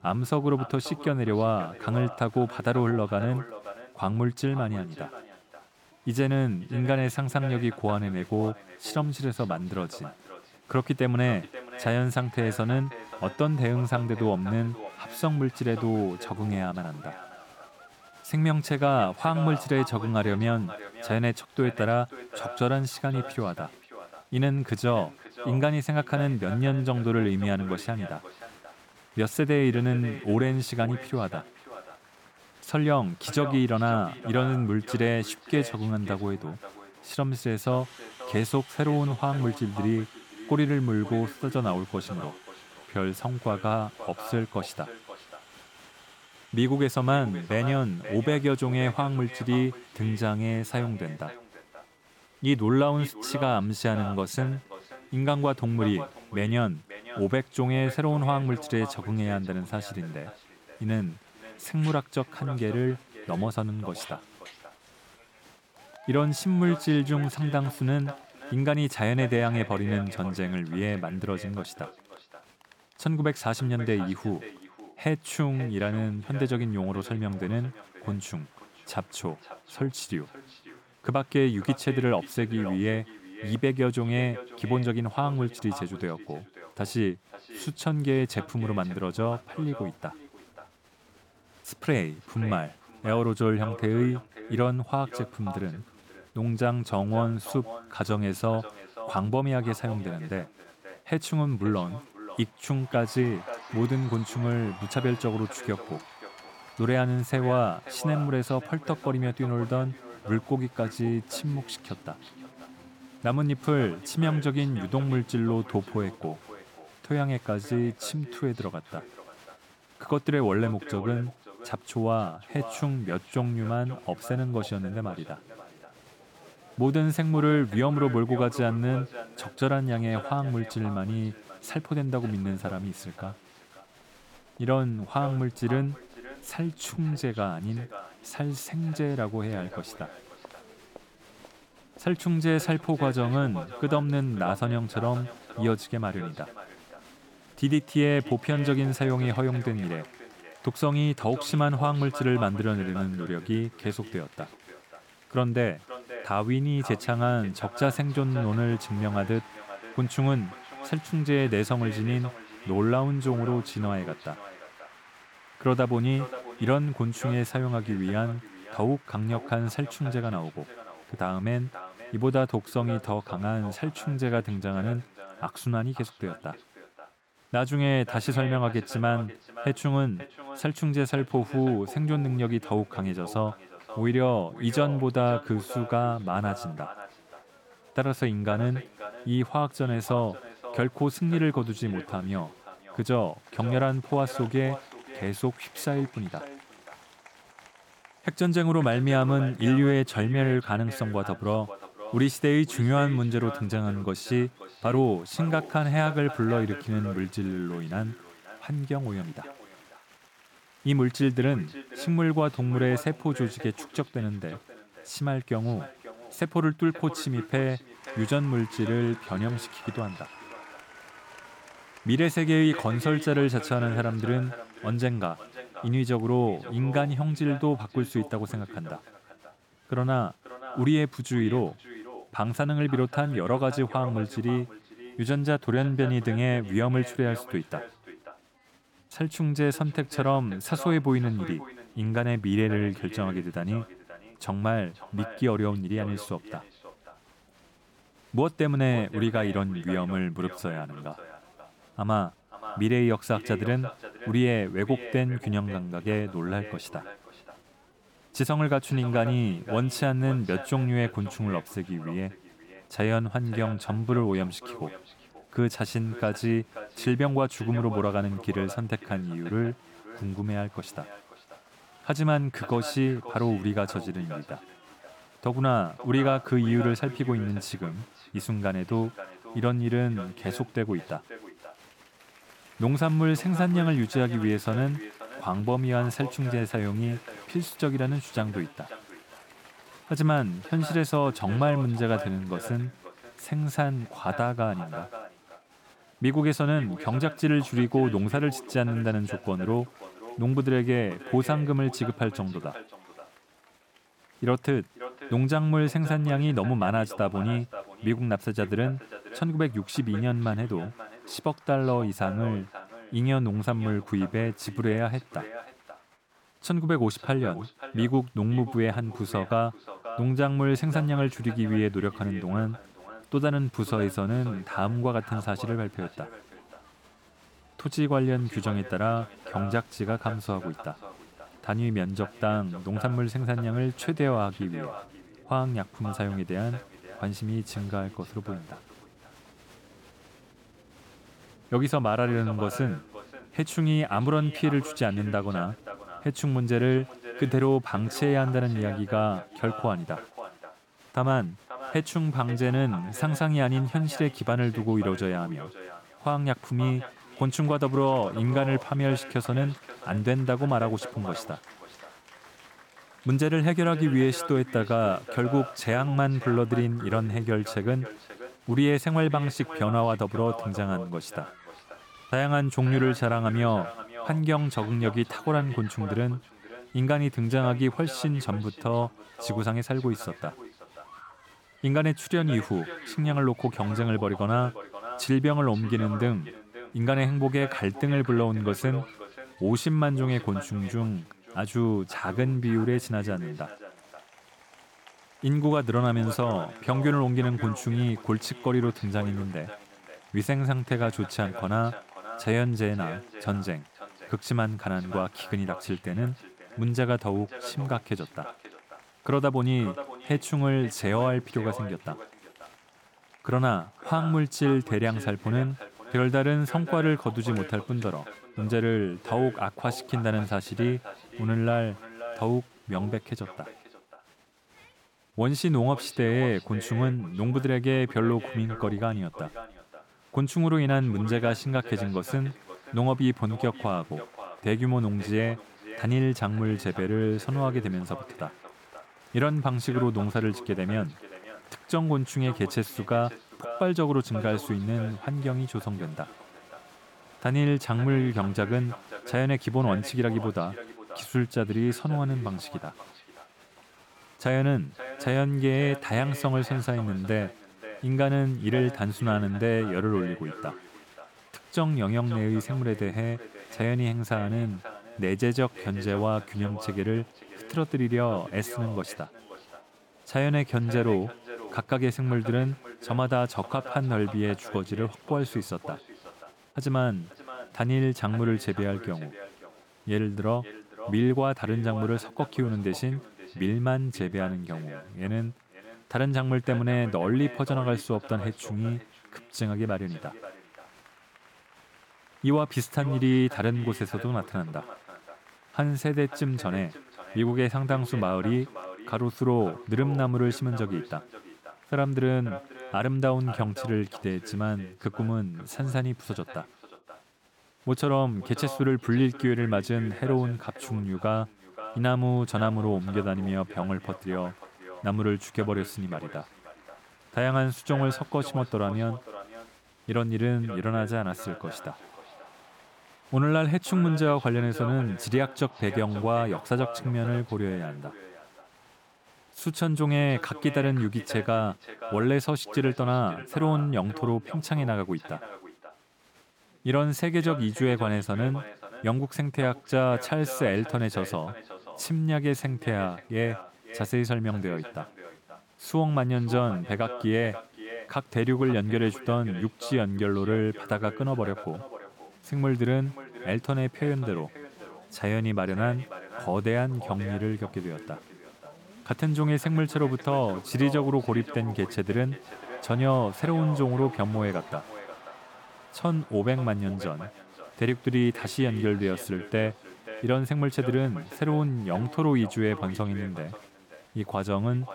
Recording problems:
echo of what is said; noticeable; throughout; 530 ms later, 15 dB below the speech
crowd noise; faint; throughout; 25 dB below the speech

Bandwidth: 18 kHz